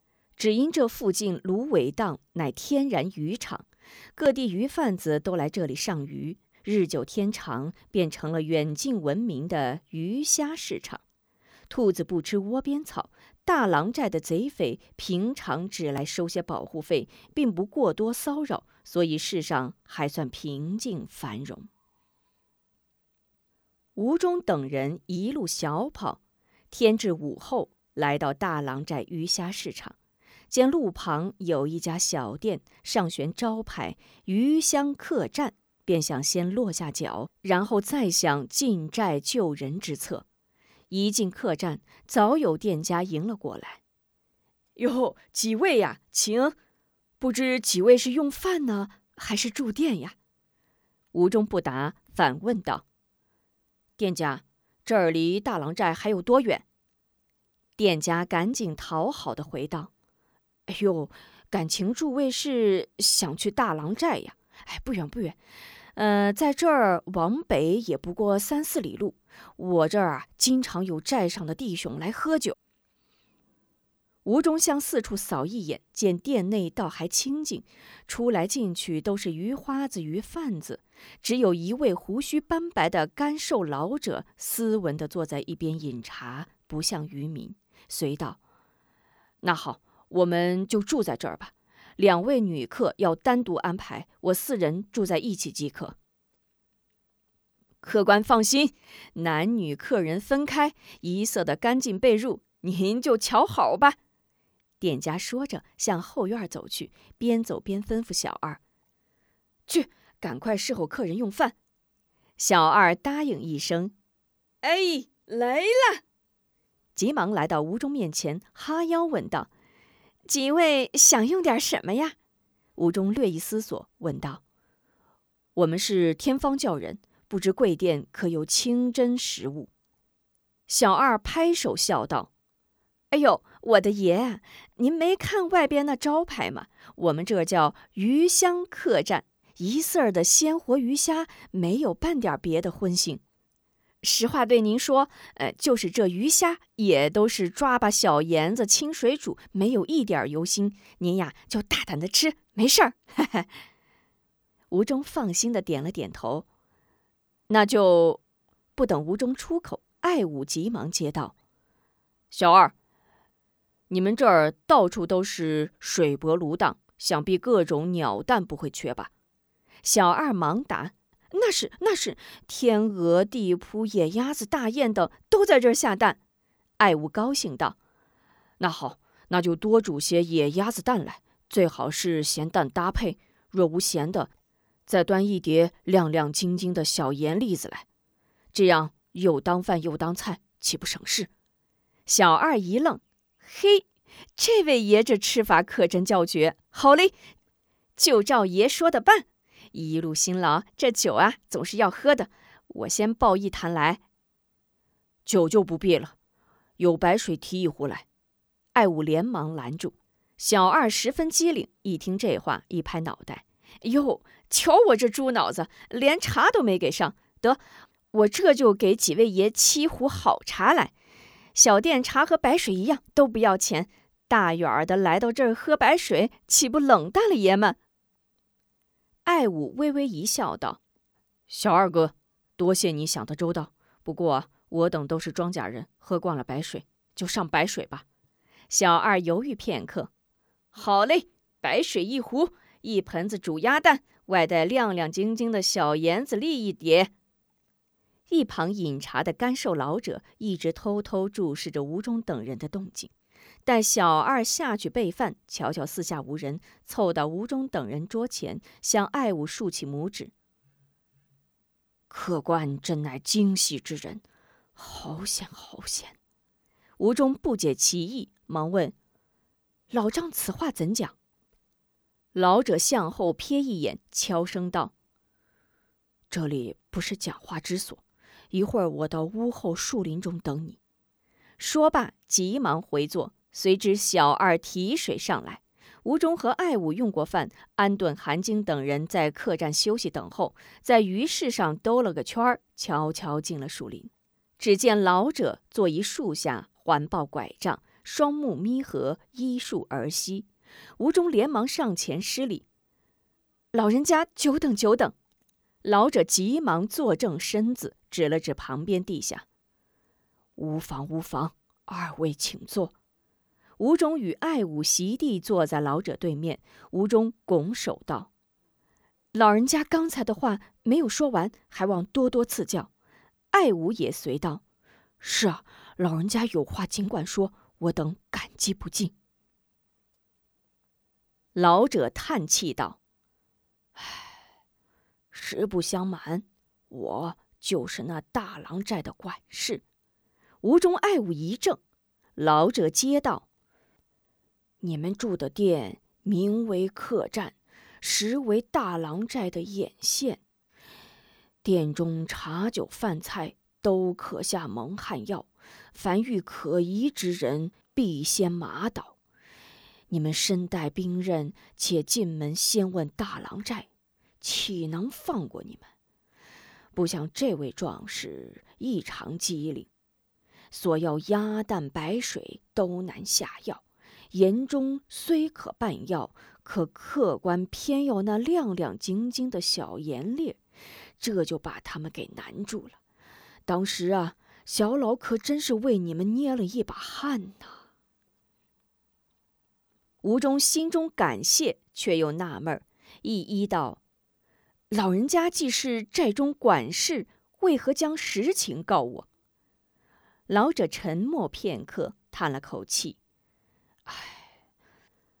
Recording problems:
none

